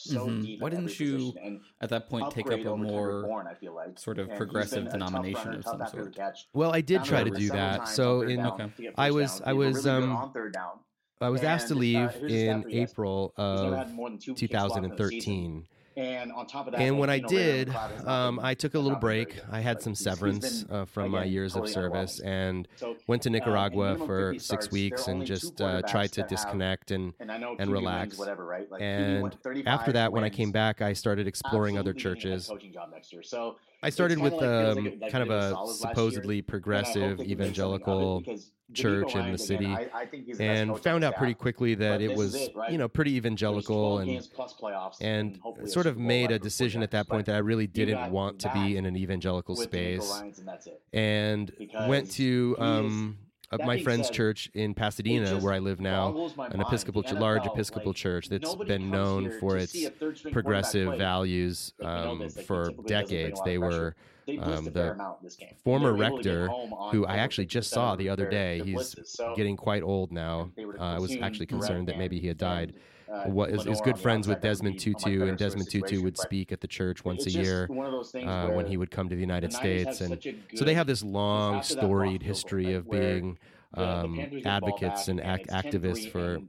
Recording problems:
voice in the background; loud; throughout; 7 dB below the speech

